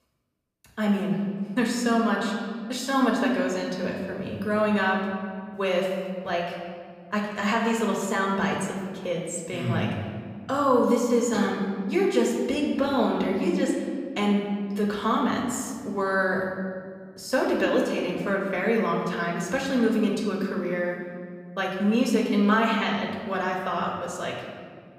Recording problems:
off-mic speech; far
room echo; noticeable; dies away in 1.7 s

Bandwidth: 15 kHz